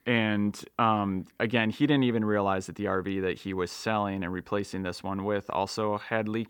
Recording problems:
none

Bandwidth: 18 kHz